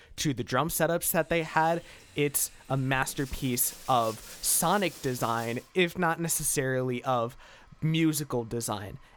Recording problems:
household noises; noticeable; throughout; 20 dB below the speech

